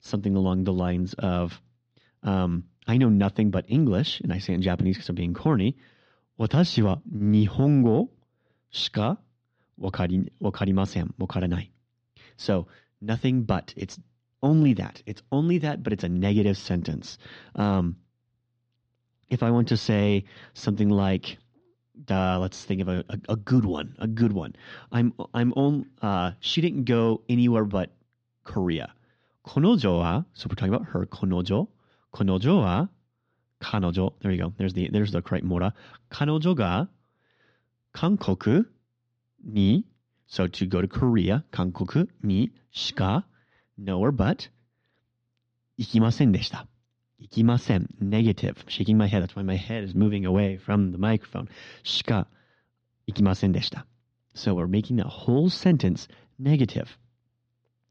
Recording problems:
muffled; slightly; fading above 4 kHz

